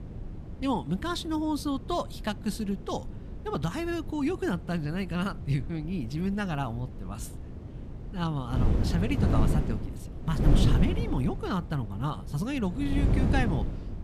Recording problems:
wind noise on the microphone; heavy; 7 dB below the speech

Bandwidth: 14.5 kHz